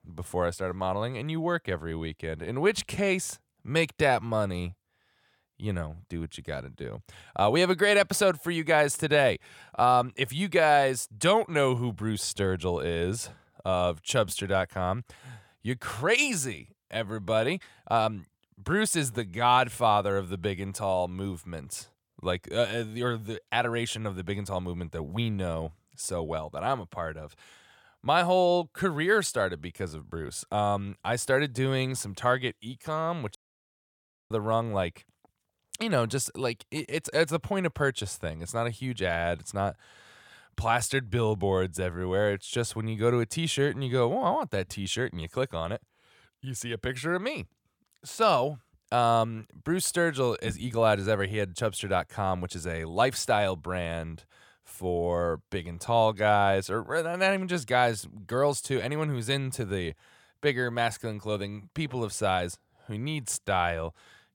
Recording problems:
audio cutting out; at 33 s for 1 s

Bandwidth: 18 kHz